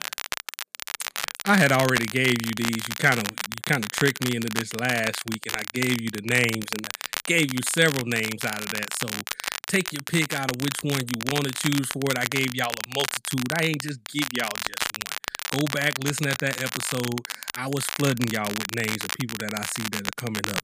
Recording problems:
crackle, like an old record; loud; 5 dB below the speech

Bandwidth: 15 kHz